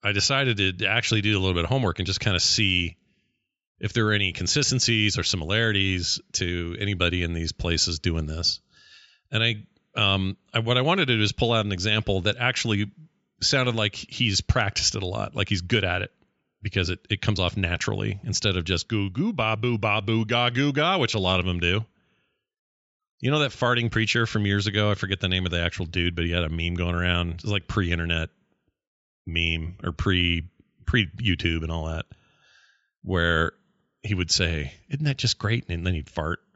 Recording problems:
high frequencies cut off; noticeable; nothing above 8 kHz

